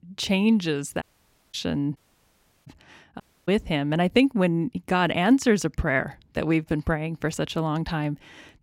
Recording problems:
audio cutting out; at 1 s for 0.5 s, at 2 s for 0.5 s and at 3 s

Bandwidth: 16 kHz